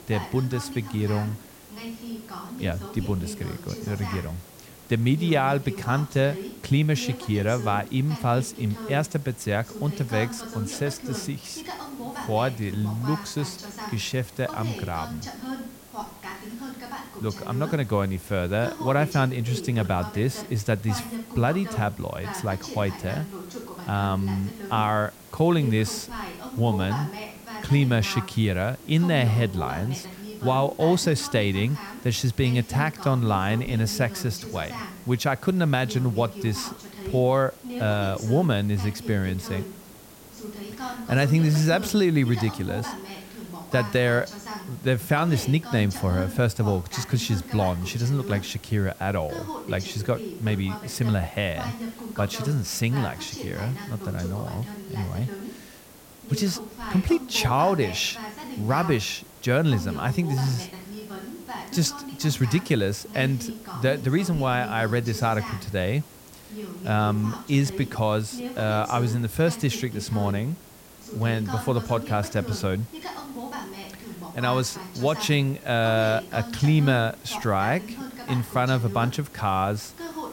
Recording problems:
voice in the background; noticeable; throughout; 10 dB below the speech
hiss; faint; throughout; 20 dB below the speech

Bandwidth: 16.5 kHz